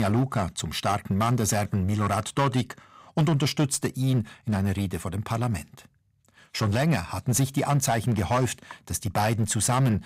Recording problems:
distortion; slight; 9% of the sound clipped
abrupt cut into speech; at the start

